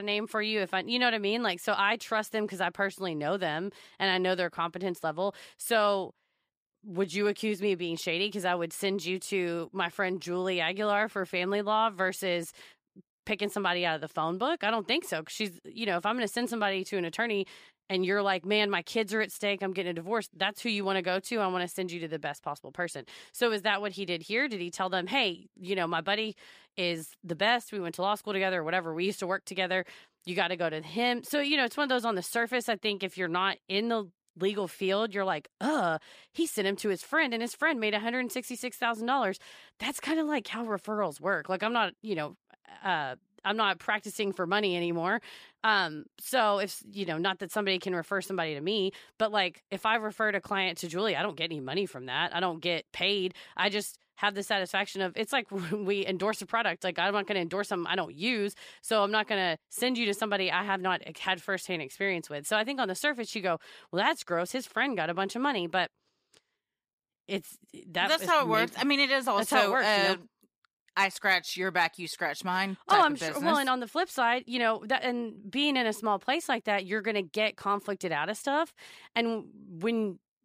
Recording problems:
abrupt cut into speech; at the start

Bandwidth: 15 kHz